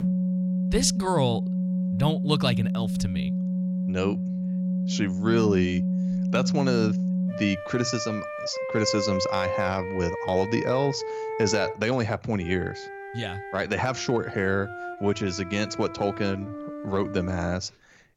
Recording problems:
background music; loud; throughout; 2 dB below the speech

